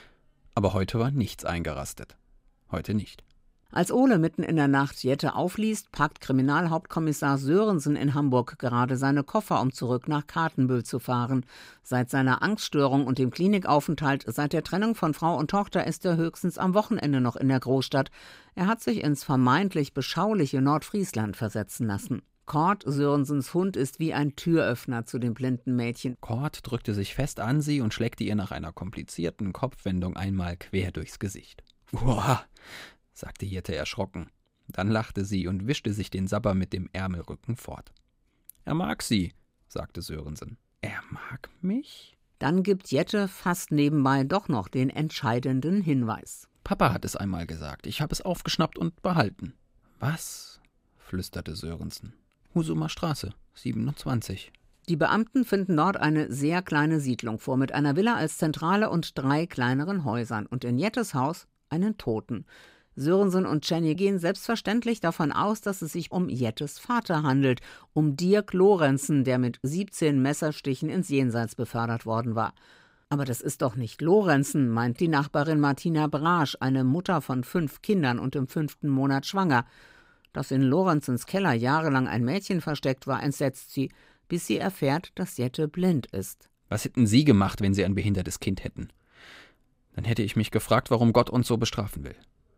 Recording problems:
none

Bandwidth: 15.5 kHz